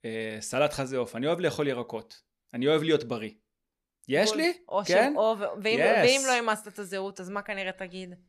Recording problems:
none

